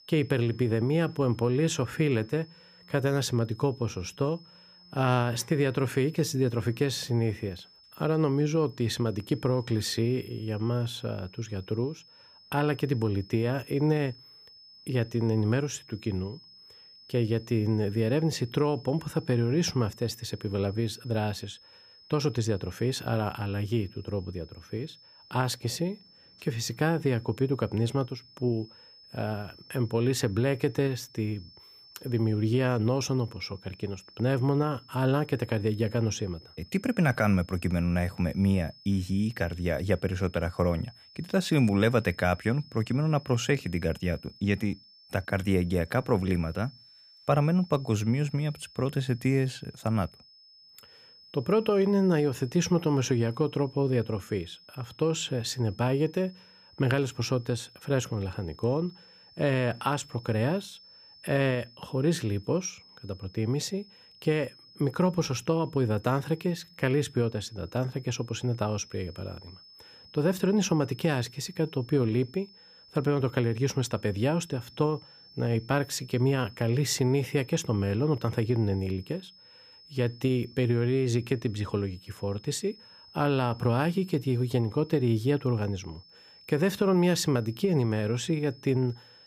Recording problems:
high-pitched whine; faint; throughout; 5 kHz, 25 dB below the speech

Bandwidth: 15 kHz